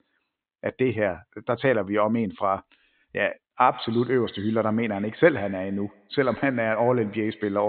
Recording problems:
high frequencies cut off; severe; nothing above 4 kHz
echo of what is said; faint; from 3.5 s on; 100 ms later, 20 dB below the speech
abrupt cut into speech; at the end

